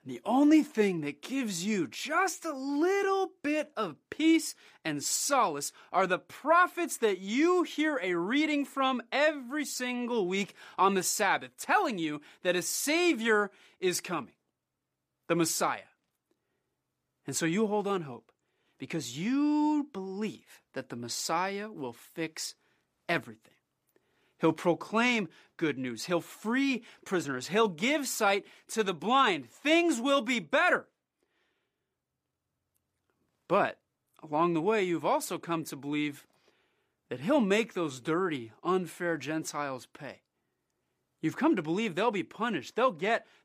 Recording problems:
none

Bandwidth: 15 kHz